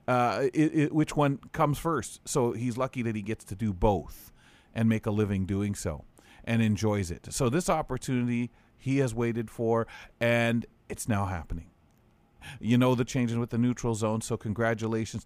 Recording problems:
none

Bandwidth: 15 kHz